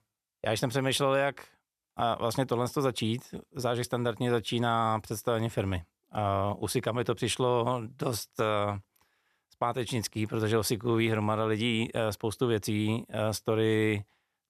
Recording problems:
none

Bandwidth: 14 kHz